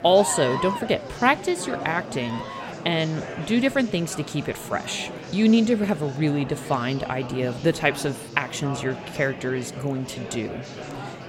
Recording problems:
murmuring crowd; noticeable; throughout; 10 dB below the speech

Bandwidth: 16 kHz